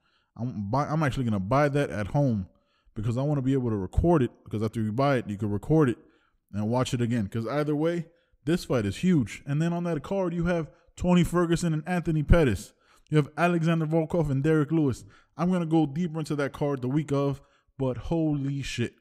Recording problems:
none

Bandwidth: 15.5 kHz